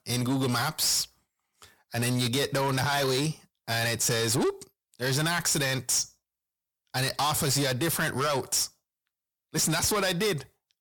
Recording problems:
distortion; heavy; 8 dB below the speech

